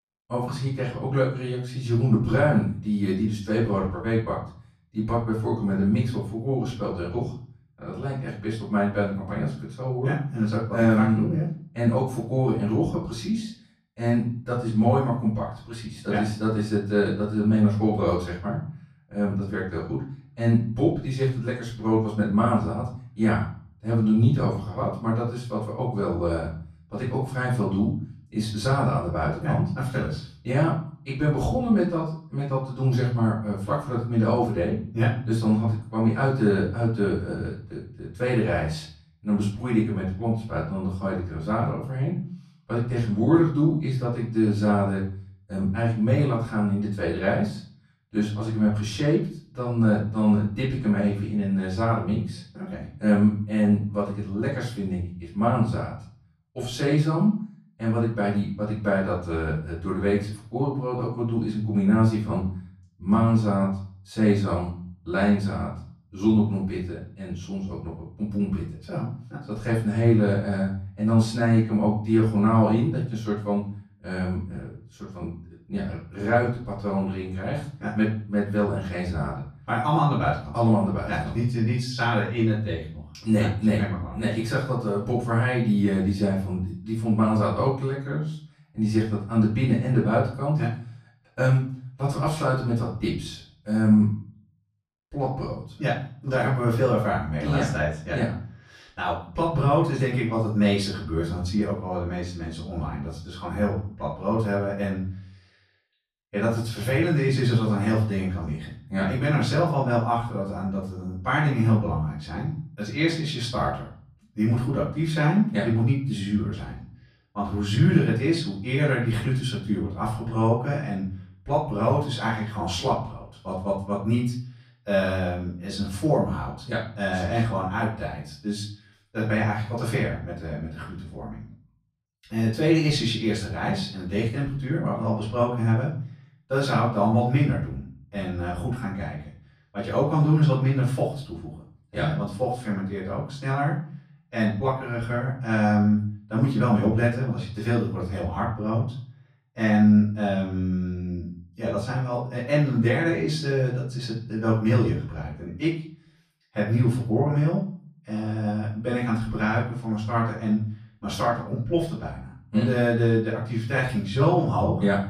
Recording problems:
off-mic speech; far
room echo; noticeable; dies away in 0.5 s

